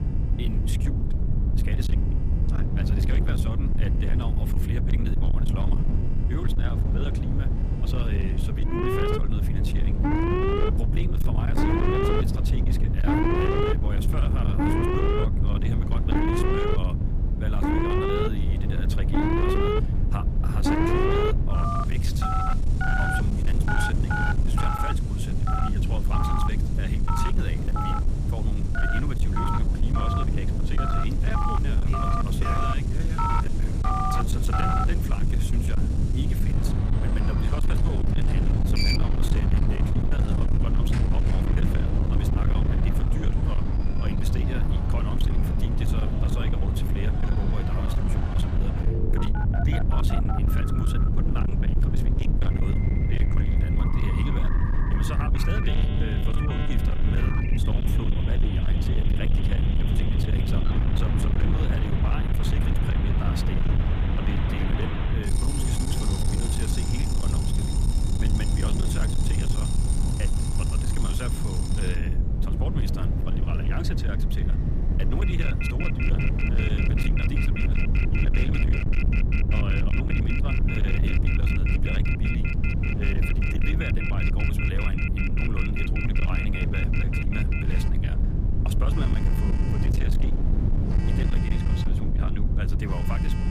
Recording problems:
distortion; slight; 18% of the sound clipped
alarms or sirens; very loud; throughout; 5 dB above the speech
wind noise on the microphone; heavy; 5 dB below the speech
low rumble; very loud; throughout; 1 dB above the speech
train or aircraft noise; faint; from 47 s on; 20 dB below the speech

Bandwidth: 14.5 kHz